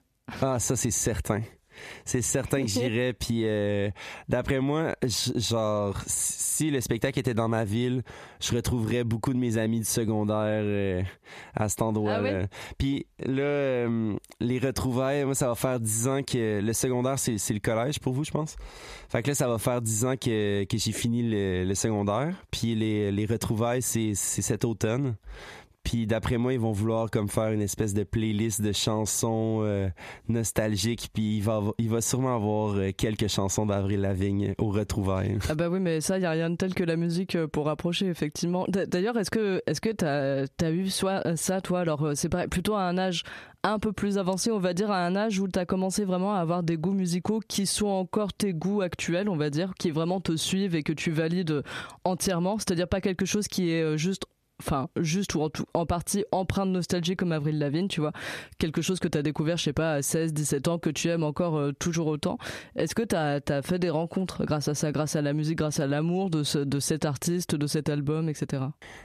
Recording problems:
squashed, flat; heavily

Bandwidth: 14.5 kHz